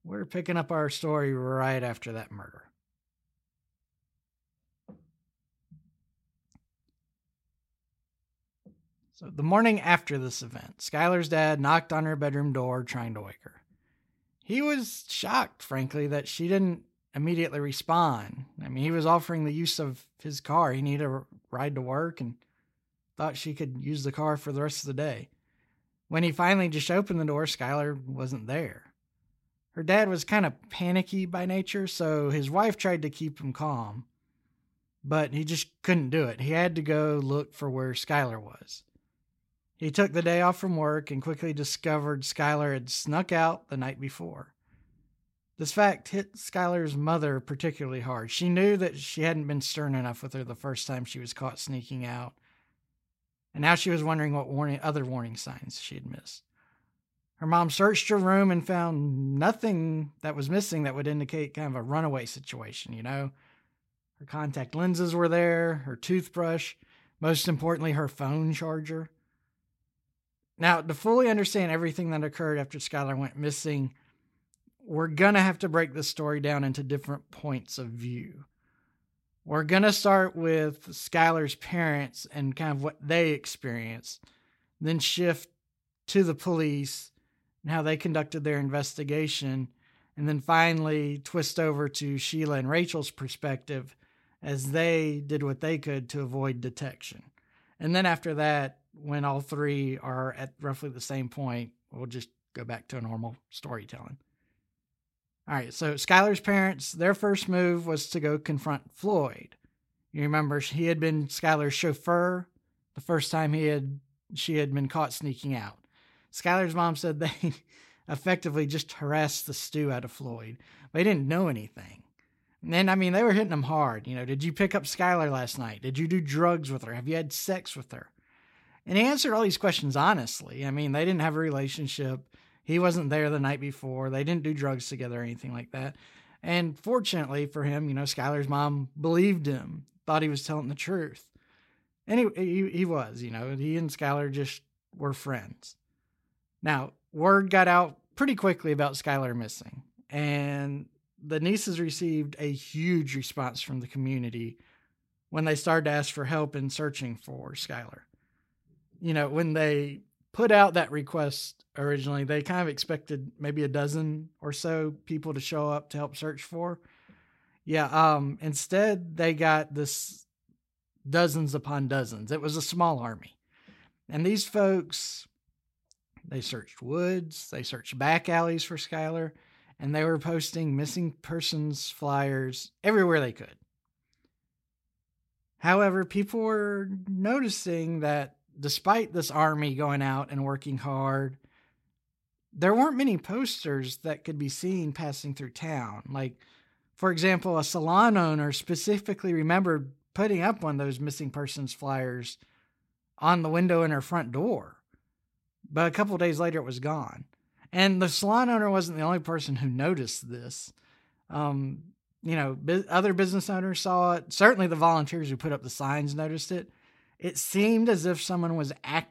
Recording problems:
none

